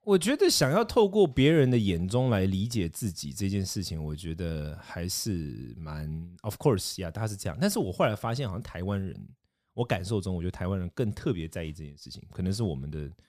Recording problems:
none

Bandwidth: 14.5 kHz